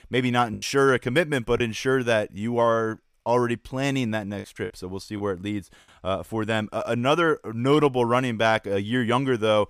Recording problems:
choppy; occasionally; from 0.5 to 3.5 s and at 4.5 s; 4% of the speech affected

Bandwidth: 15 kHz